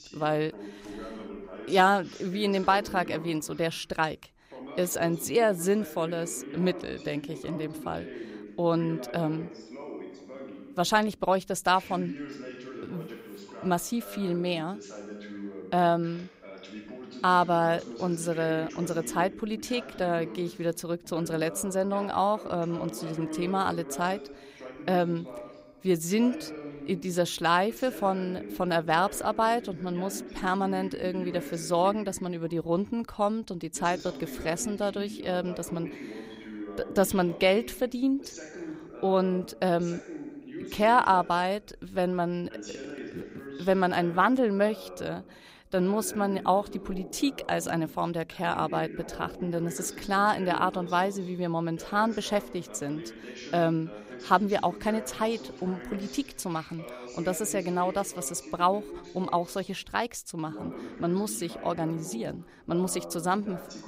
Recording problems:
voice in the background; noticeable; throughout; 15 dB below the speech

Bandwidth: 15.5 kHz